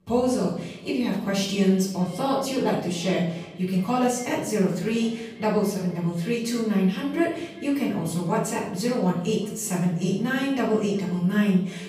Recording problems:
off-mic speech; far
room echo; noticeable; dies away in 0.7 s
echo of what is said; faint; throughout; 360 ms later, 20 dB below the speech

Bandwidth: 15 kHz